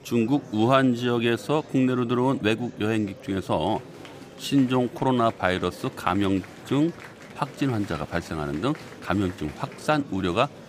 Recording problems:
murmuring crowd; noticeable; throughout; 15 dB below the speech

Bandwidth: 15 kHz